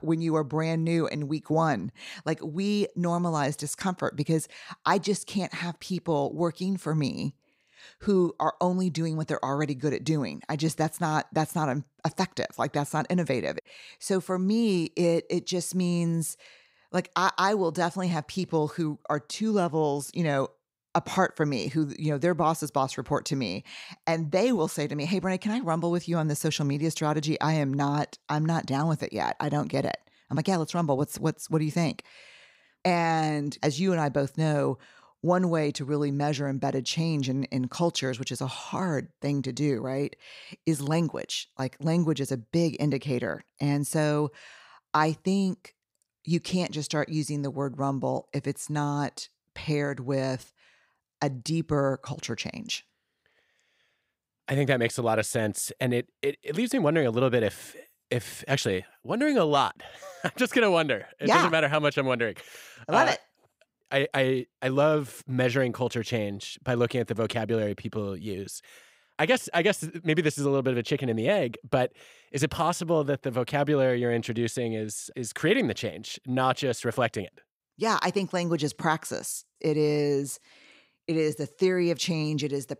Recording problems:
none

